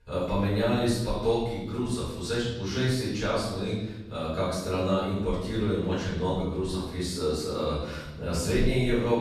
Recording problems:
room echo; strong; dies away in 1 s
off-mic speech; far

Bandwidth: 13.5 kHz